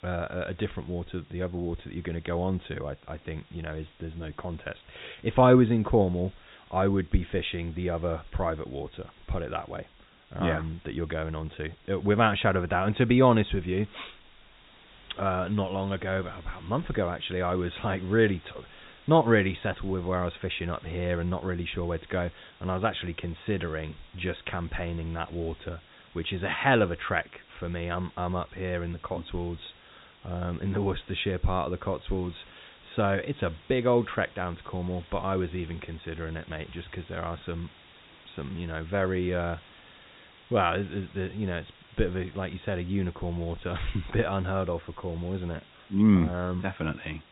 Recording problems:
high frequencies cut off; severe; nothing above 4 kHz
hiss; faint; throughout; 25 dB below the speech

